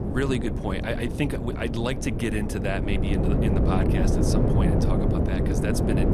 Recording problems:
wind noise on the microphone; heavy; as loud as the speech

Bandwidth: 14.5 kHz